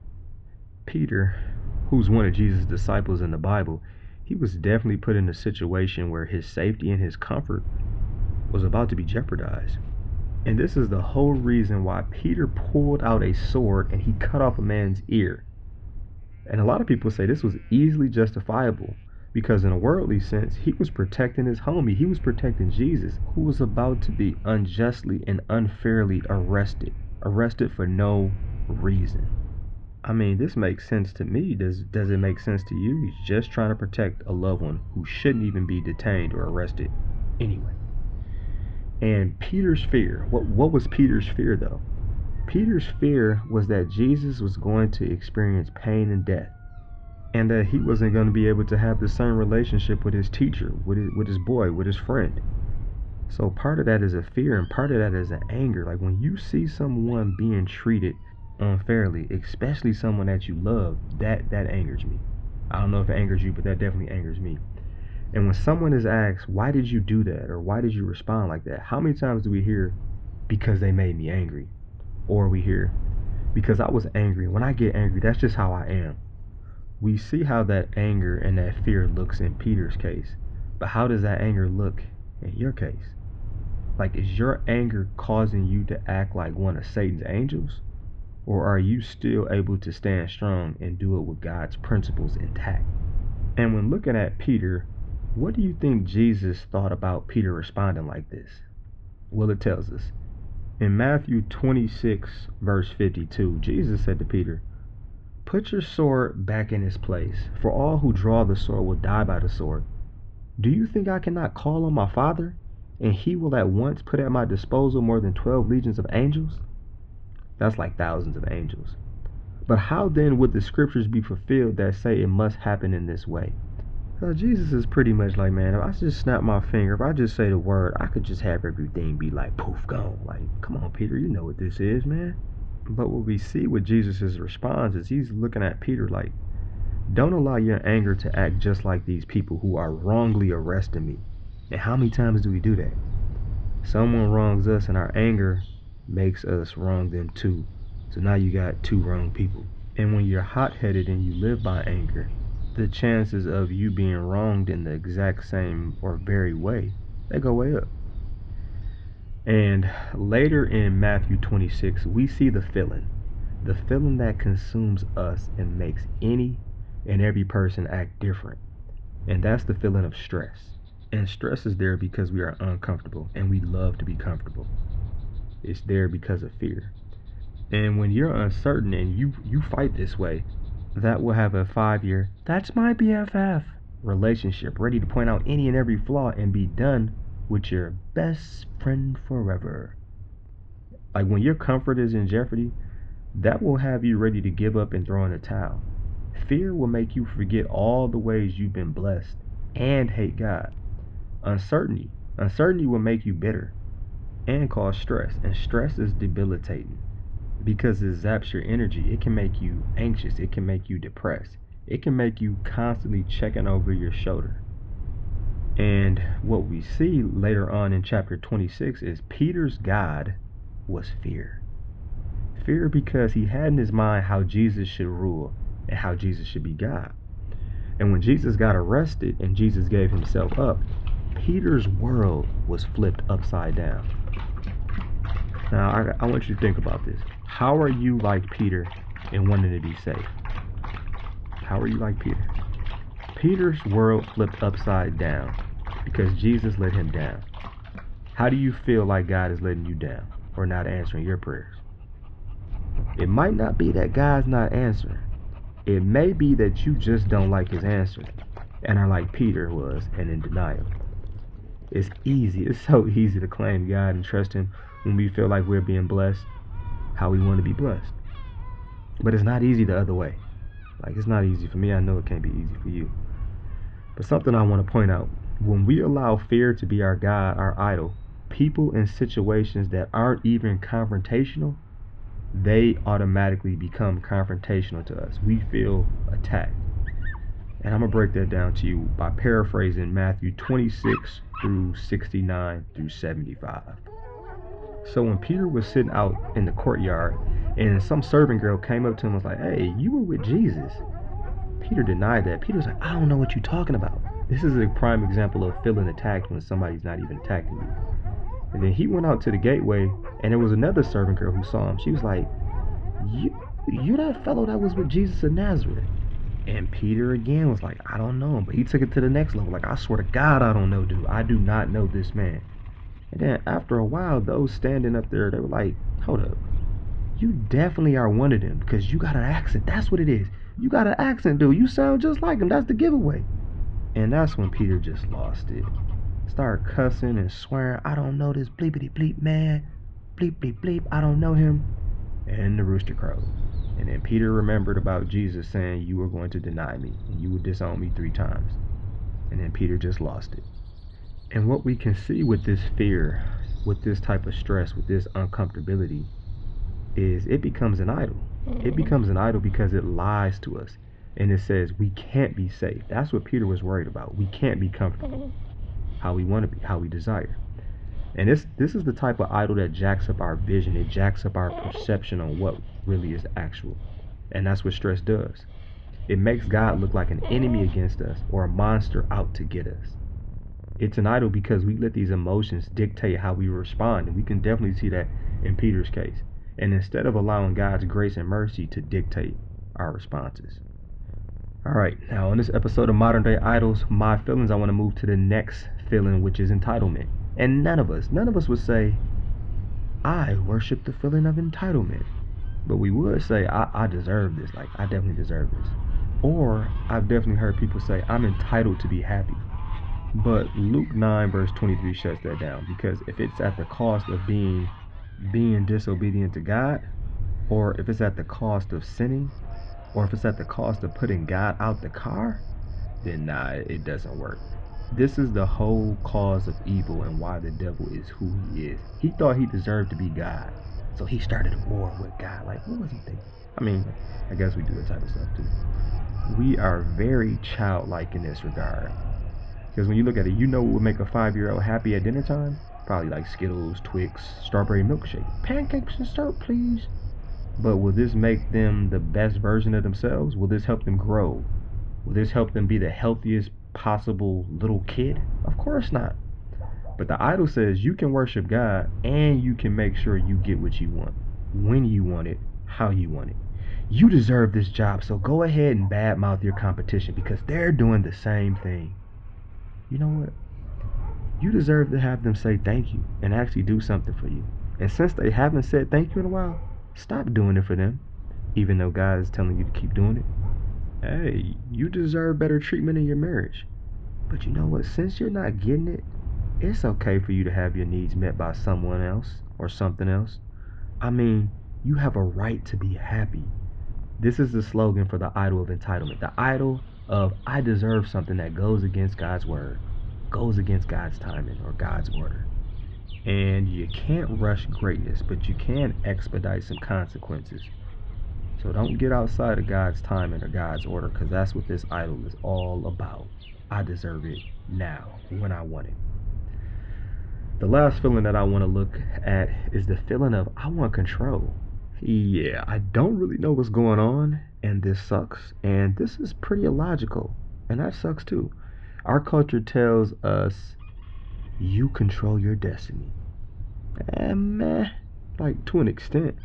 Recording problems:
muffled; very; fading above 3.5 kHz
animal sounds; faint; throughout; 20 dB below the speech
low rumble; faint; throughout; 20 dB below the speech

